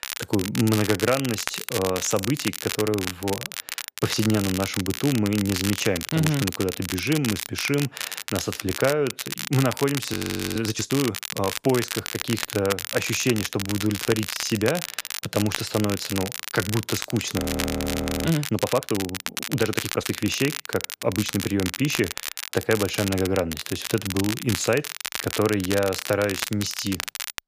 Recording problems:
crackle, like an old record; loud; 5 dB below the speech
audio freezing; at 10 s and at 17 s for 1 s

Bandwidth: 15 kHz